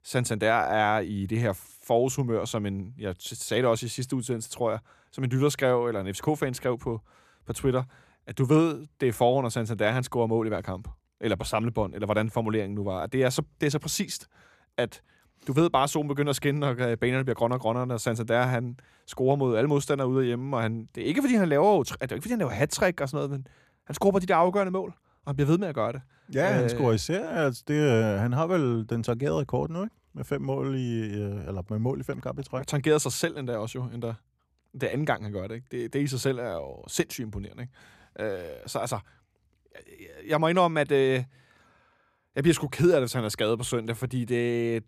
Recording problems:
none

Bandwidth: 14 kHz